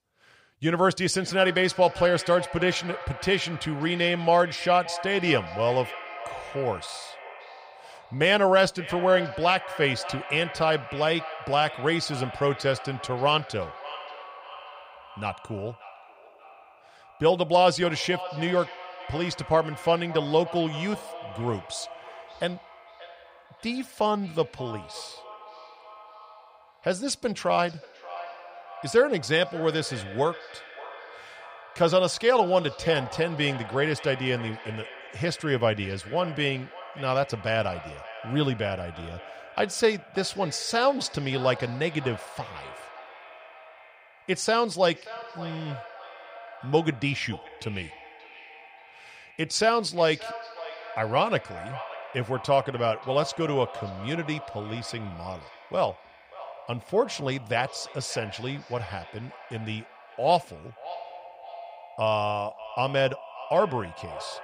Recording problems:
echo of what is said; noticeable; throughout; 580 ms later, 15 dB below the speech

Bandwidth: 15.5 kHz